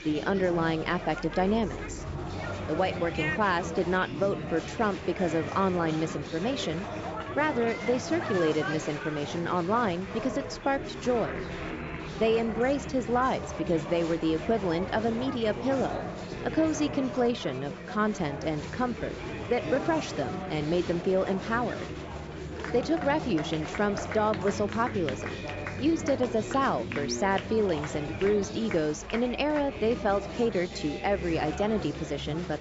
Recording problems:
high frequencies cut off; noticeable; nothing above 8 kHz
chatter from many people; loud; throughout; 7 dB below the speech

